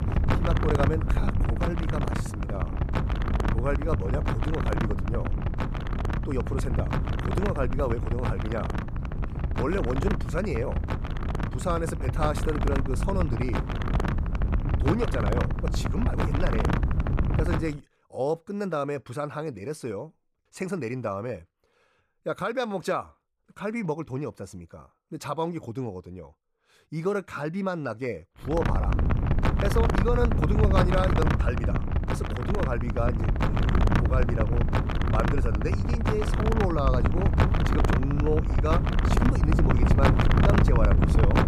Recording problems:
wind noise on the microphone; heavy; until 18 s and from 29 s on; as loud as the speech

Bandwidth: 15 kHz